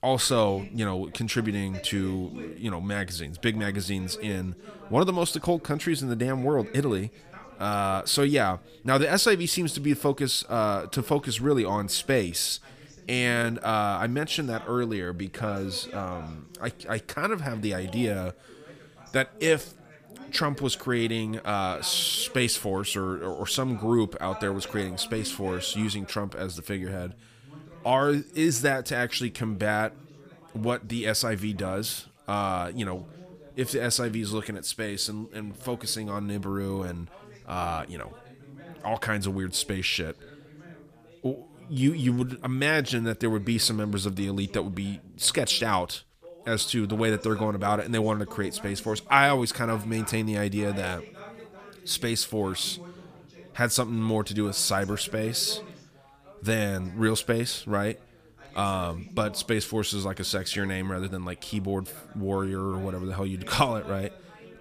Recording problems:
background chatter; faint; throughout; 3 voices, 20 dB below the speech

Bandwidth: 15 kHz